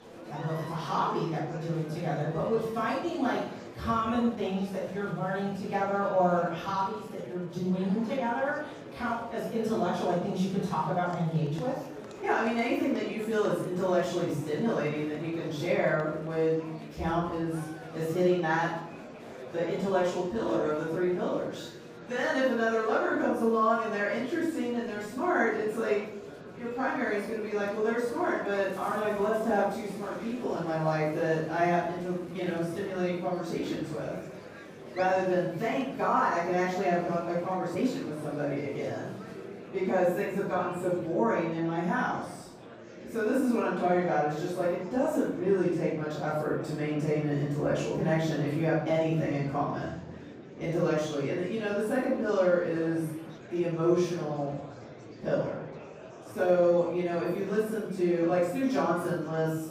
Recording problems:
room echo; strong; dies away in 0.7 s
off-mic speech; far
murmuring crowd; noticeable; throughout; 15 dB below the speech
uneven, jittery; slightly; from 4.5 to 57 s

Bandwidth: 15 kHz